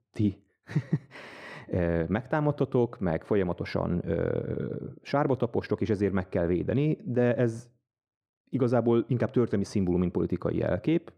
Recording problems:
muffled; very; fading above 2.5 kHz

